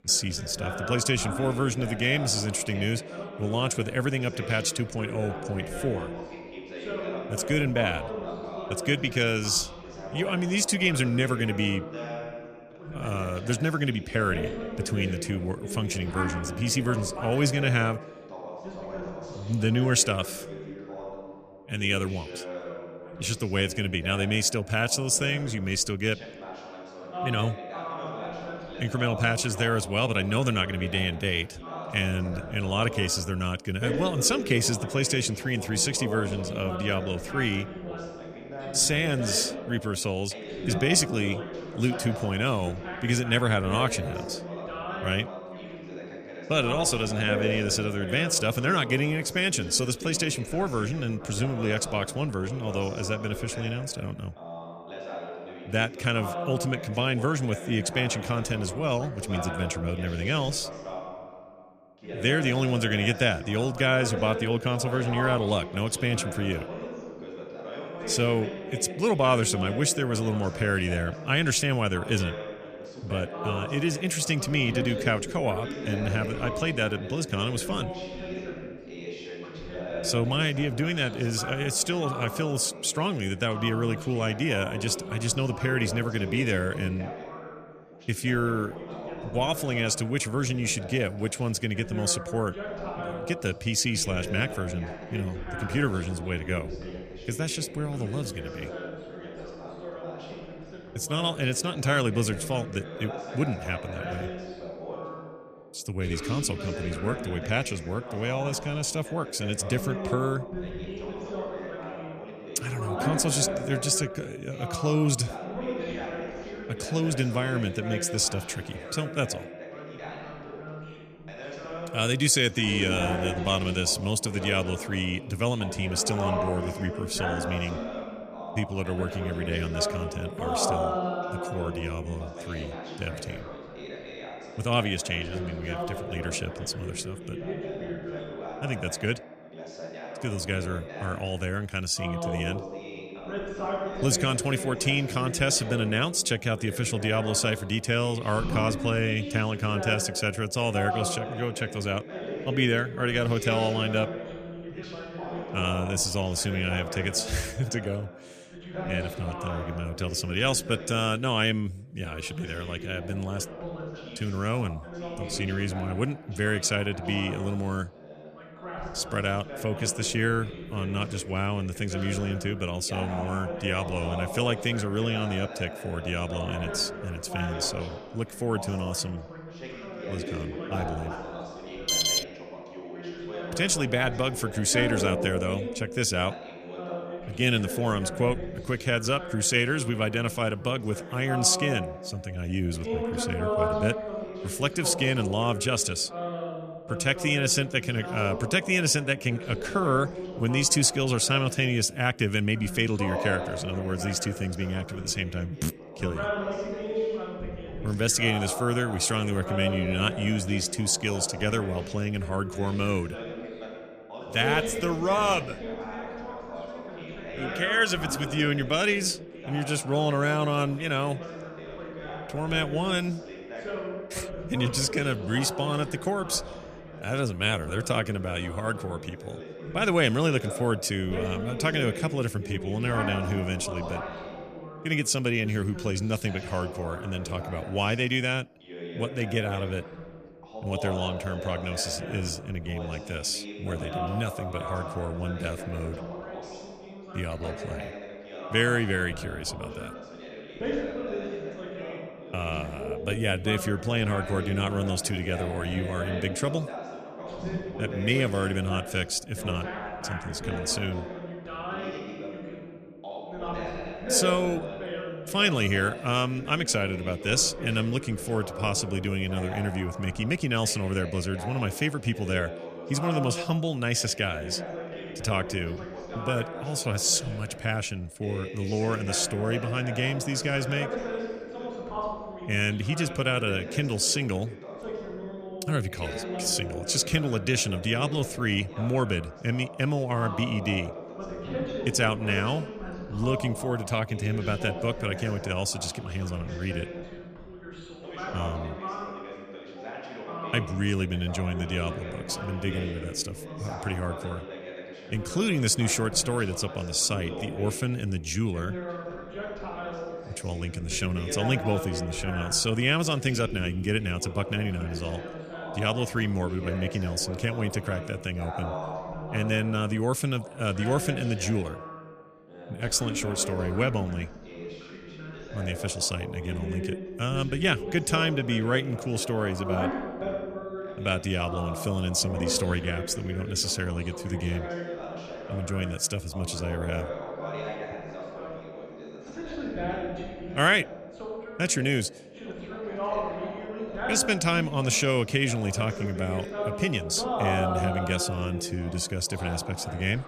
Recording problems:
background chatter; loud; throughout; 2 voices, 9 dB below the speech
alarm; loud; at 3:02; peak 6 dB above the speech

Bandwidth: 14.5 kHz